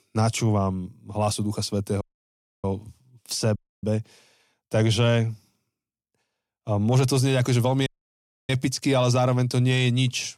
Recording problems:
audio cutting out; at 2 s for 0.5 s, at 3.5 s and at 8 s for 0.5 s

